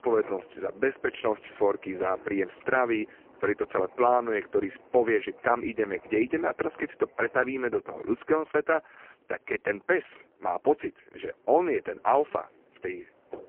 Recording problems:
phone-call audio; poor line
wind in the background; faint; throughout; 25 dB below the speech

